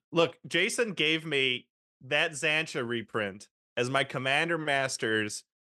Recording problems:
none

